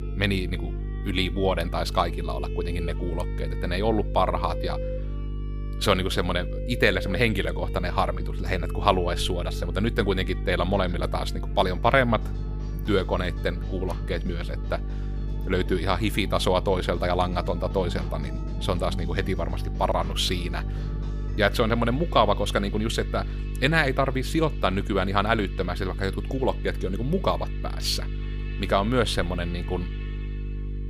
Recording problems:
electrical hum; noticeable; throughout; 50 Hz, 20 dB below the speech
background music; noticeable; throughout; 15 dB below the speech

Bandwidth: 15 kHz